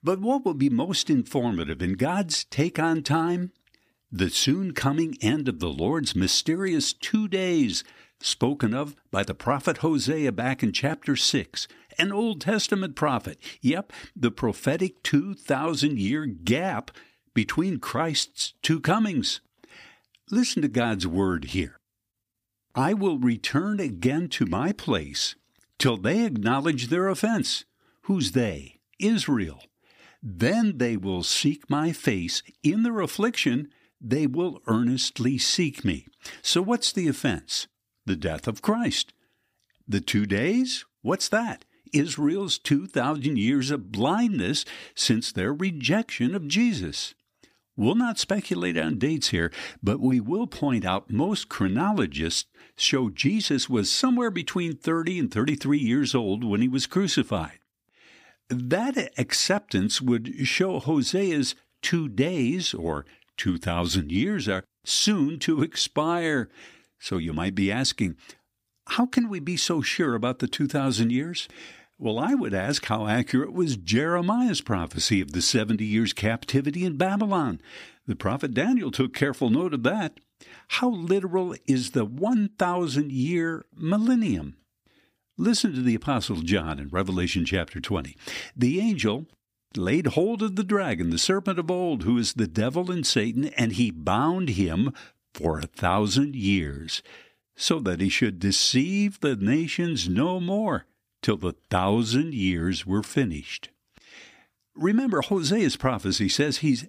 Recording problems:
none

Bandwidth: 15 kHz